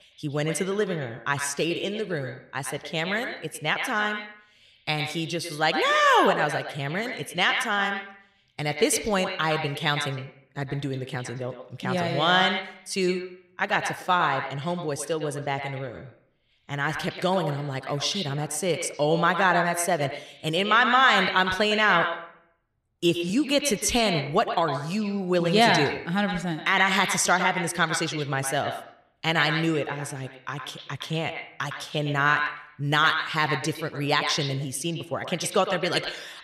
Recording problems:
echo of what is said; strong; throughout; 110 ms later, 6 dB below the speech

